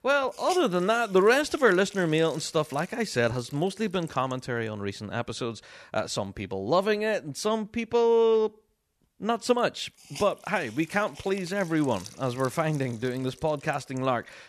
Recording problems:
hiss; noticeable; throughout; 20 dB below the speech

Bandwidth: 13.5 kHz